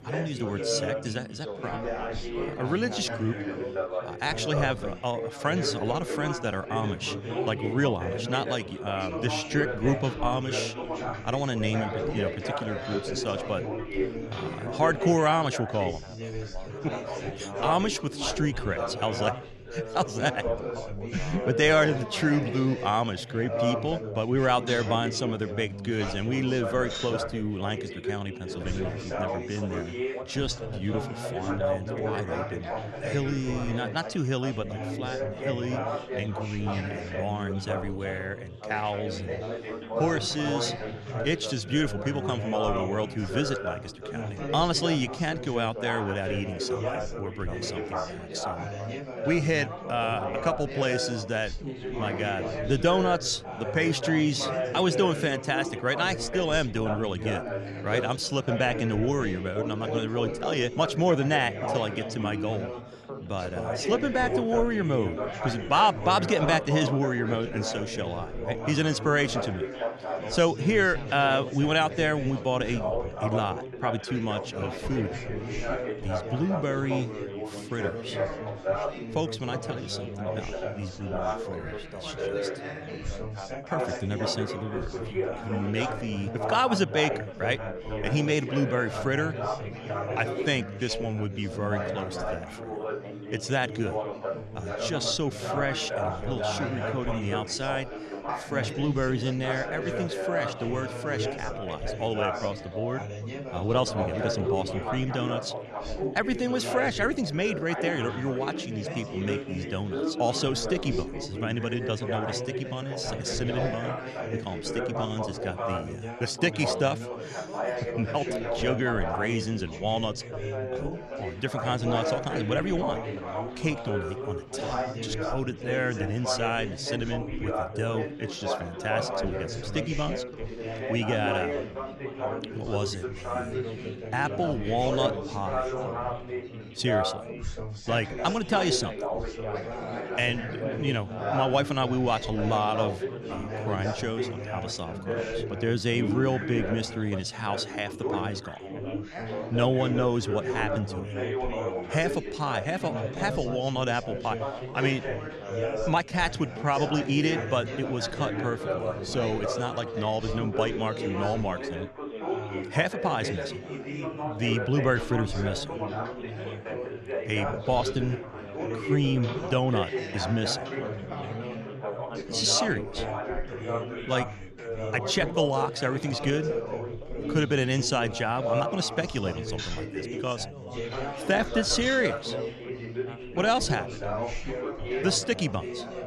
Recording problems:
chatter from many people; loud; throughout; 4 dB below the speech

